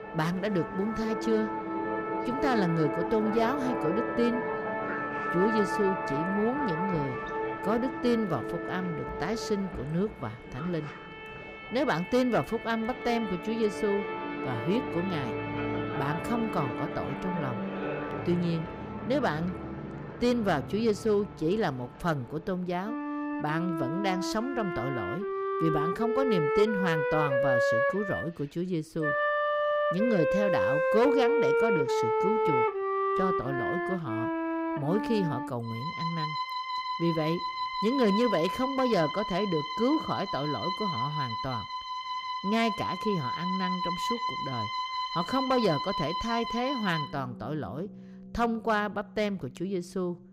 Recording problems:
background music; loud; throughout; 1 dB below the speech

